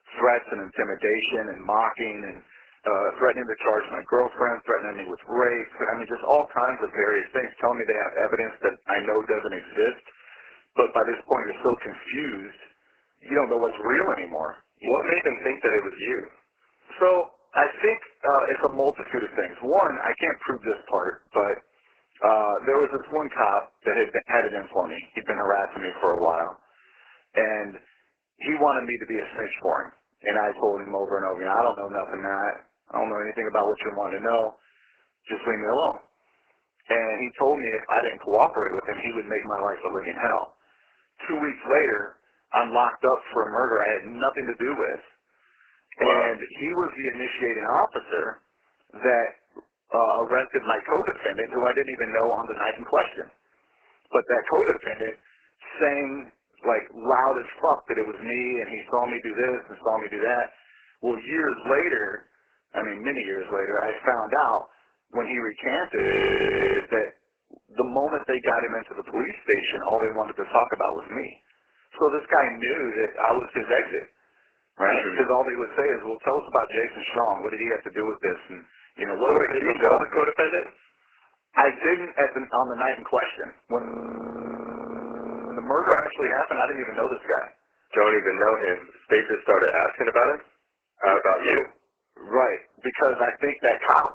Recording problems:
garbled, watery; badly; nothing above 3 kHz
thin; very; fading below 400 Hz
audio freezing; at 1:06 for 1 s and at 1:24 for 1.5 s

